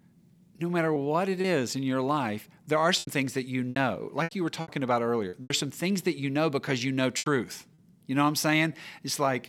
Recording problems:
choppy; very; 6% of the speech affected

